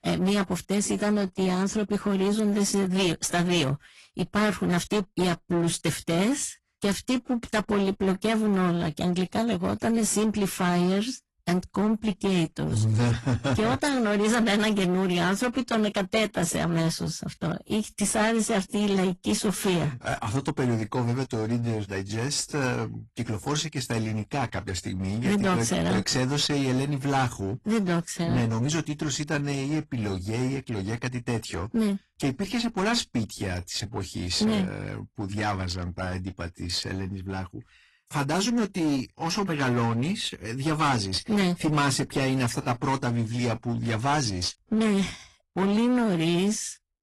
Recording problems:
distortion; slight; 16% of the sound clipped
garbled, watery; slightly; nothing above 11.5 kHz

